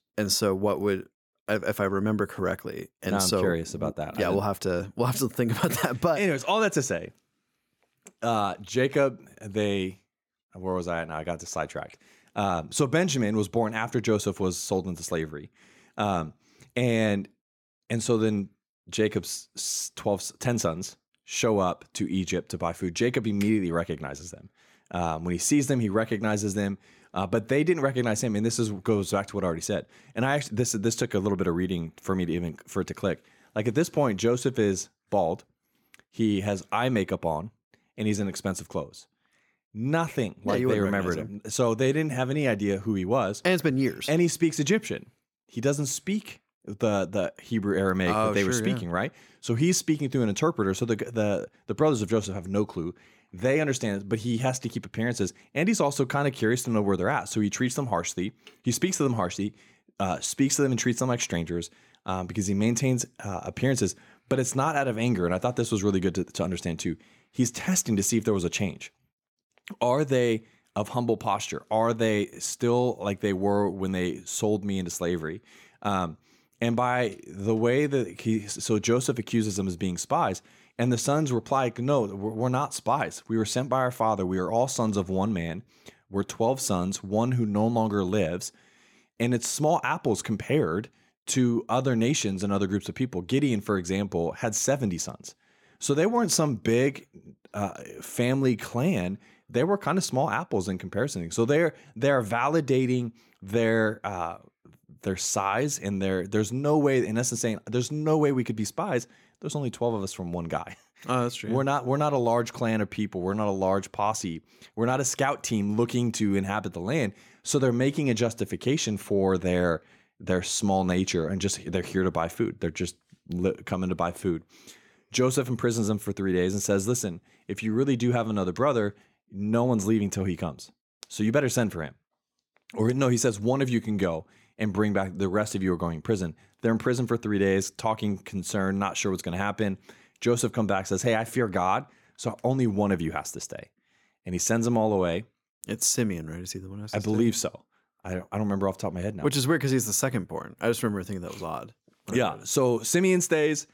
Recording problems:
none

